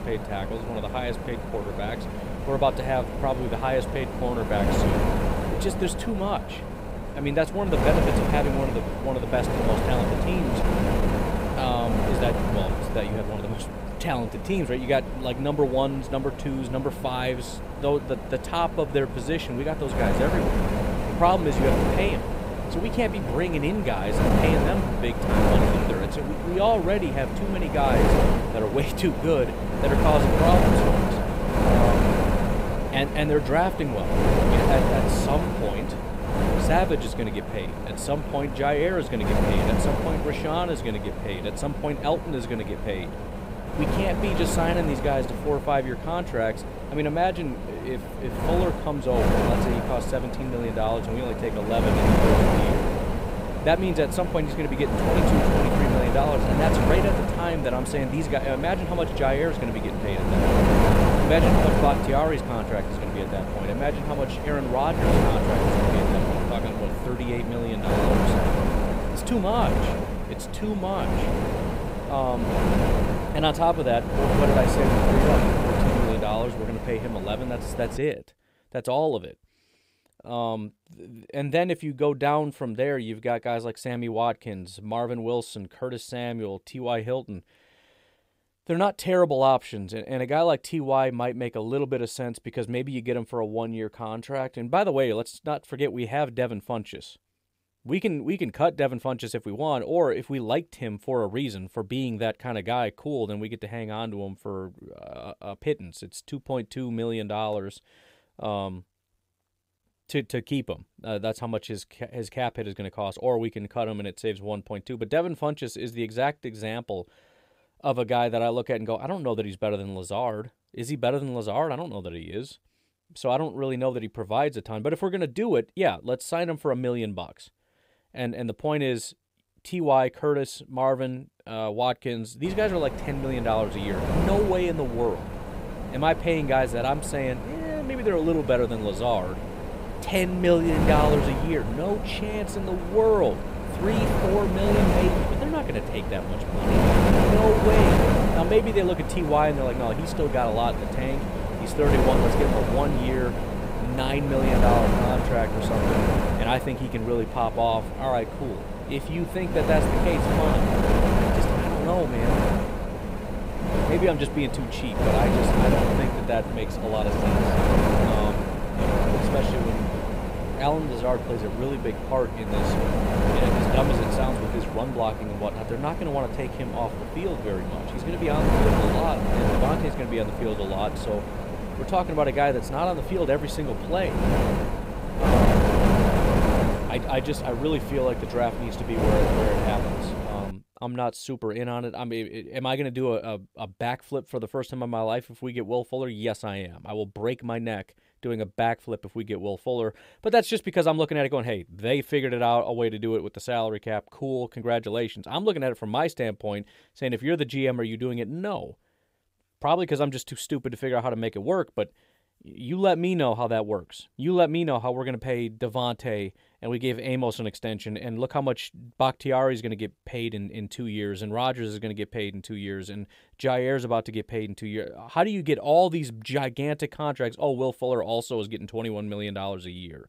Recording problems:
wind noise on the microphone; heavy; until 1:18 and from 2:12 to 3:11; 1 dB below the speech

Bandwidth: 15.5 kHz